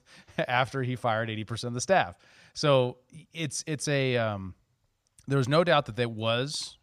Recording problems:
none

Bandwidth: 15 kHz